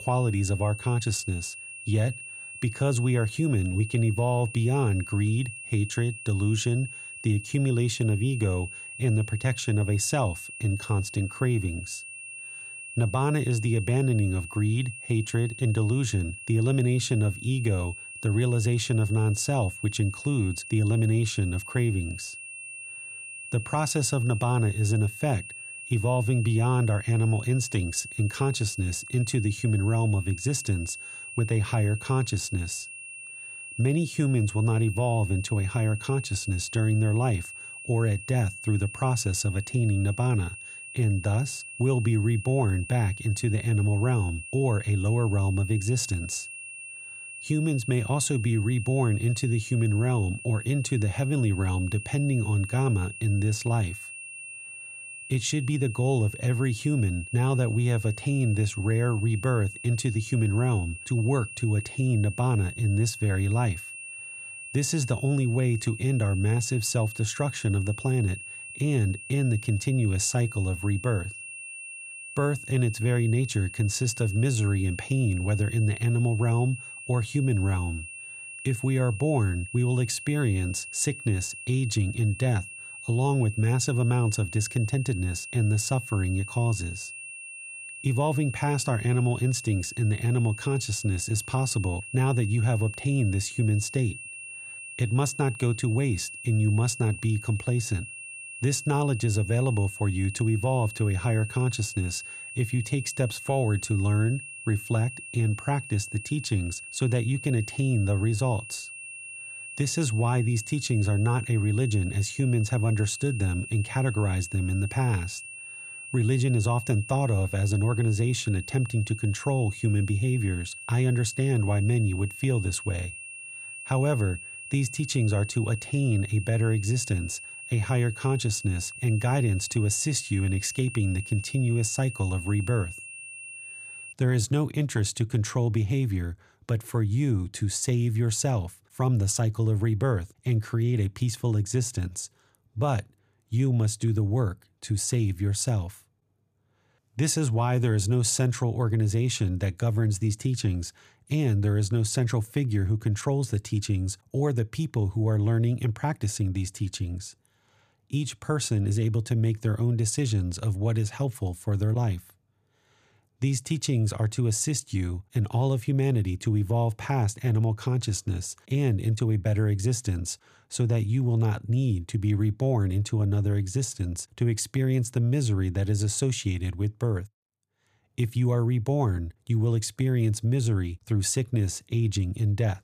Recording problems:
high-pitched whine; noticeable; until 2:14; 2.5 kHz, 10 dB below the speech

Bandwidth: 14.5 kHz